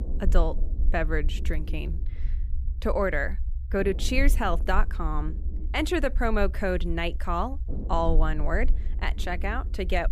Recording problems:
low rumble; faint; throughout; 20 dB below the speech

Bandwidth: 15 kHz